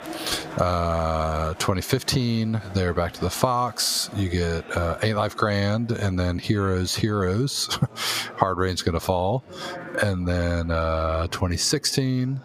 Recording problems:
squashed, flat; somewhat, background pumping
chatter from many people; noticeable; throughout; 20 dB below the speech

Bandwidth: 15 kHz